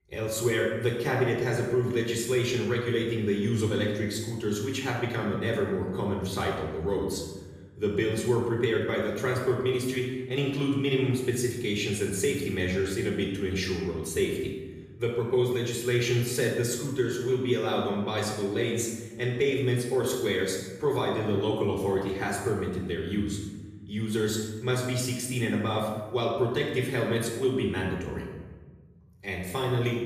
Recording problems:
off-mic speech; far
room echo; noticeable; dies away in 1.3 s

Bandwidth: 14.5 kHz